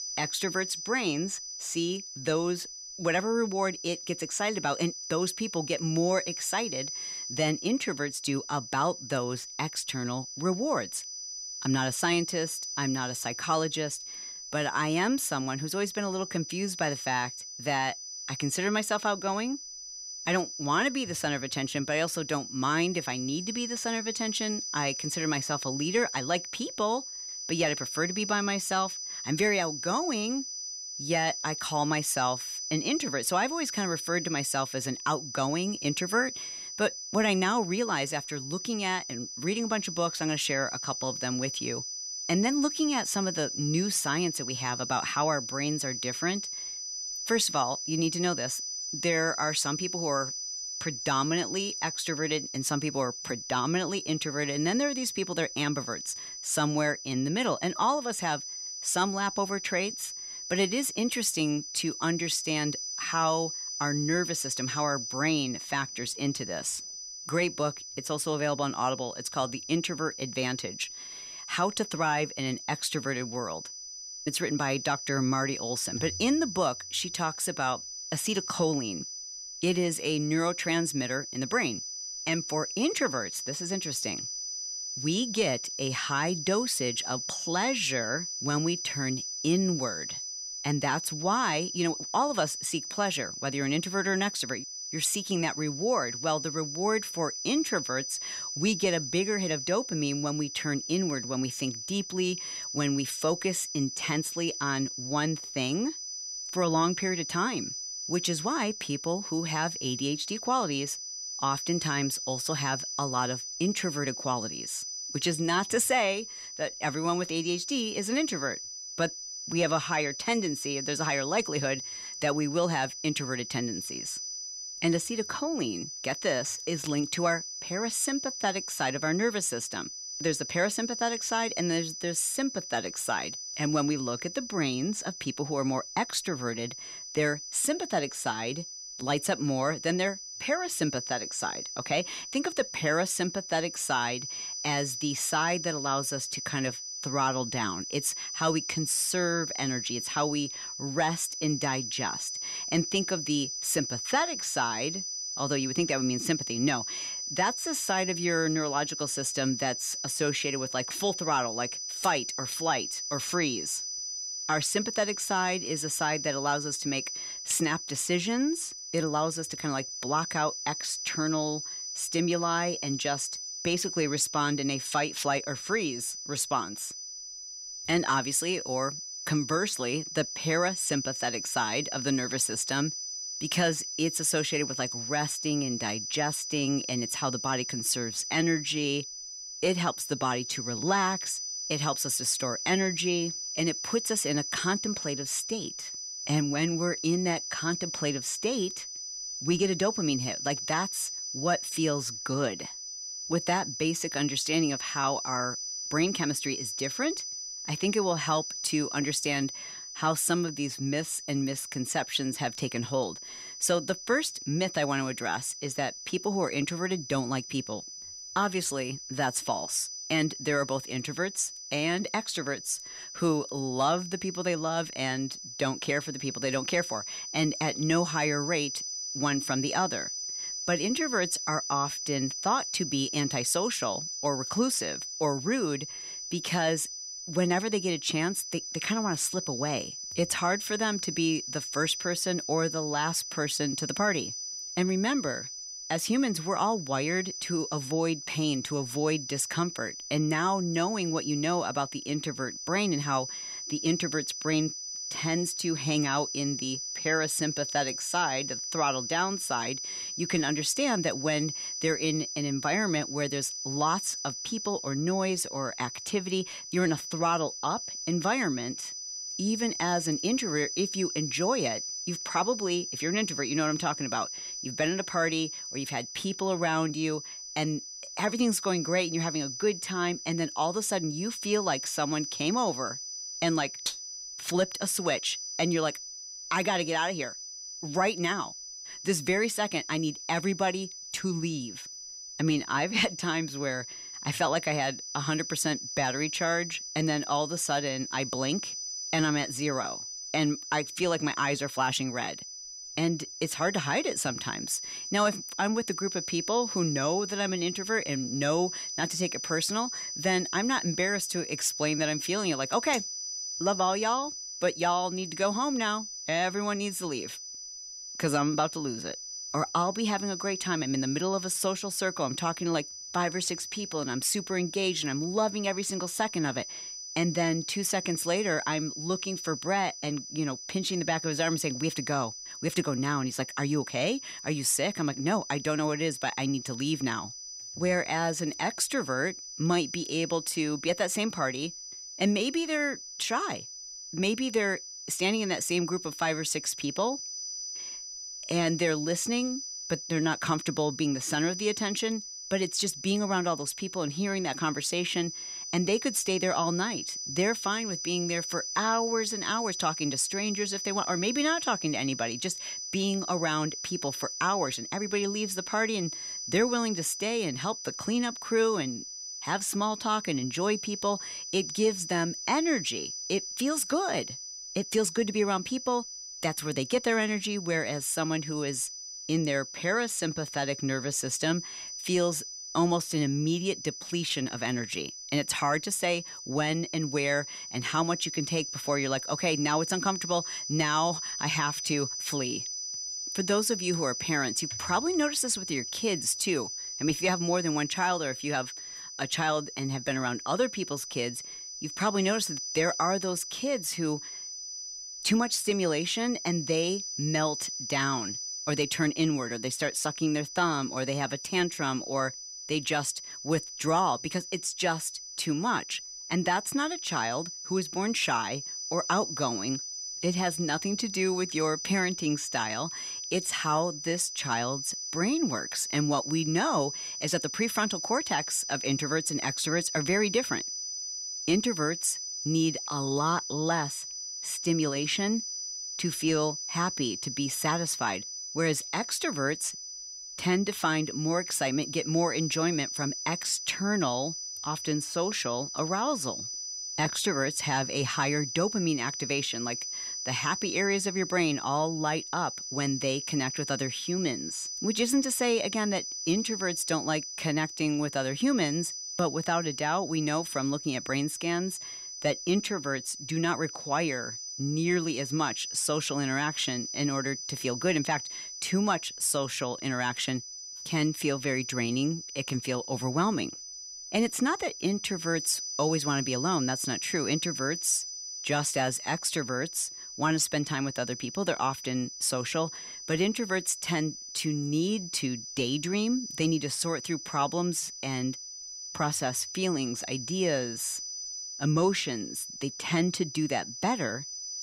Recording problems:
high-pitched whine; loud; throughout; 6 kHz, 6 dB below the speech

